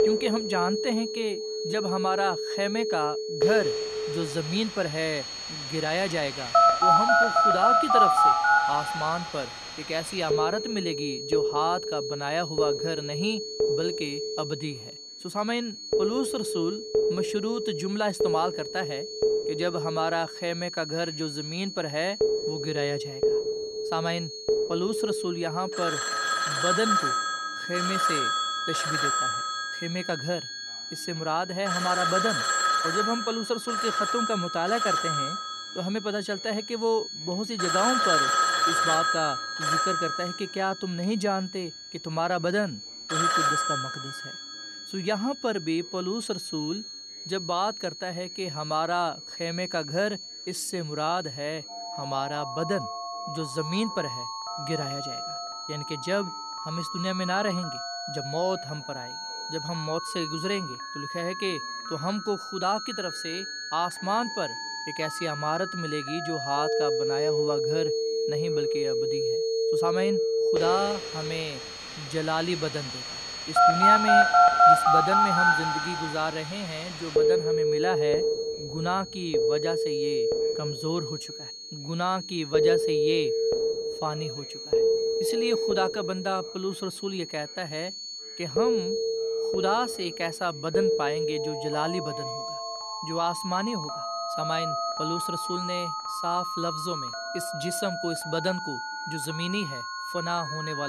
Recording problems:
alarms or sirens; very loud; throughout; 4 dB above the speech
high-pitched whine; loud; throughout; 4.5 kHz, 6 dB below the speech
background chatter; faint; throughout; 2 voices, 25 dB below the speech
abrupt cut into speech; at the end

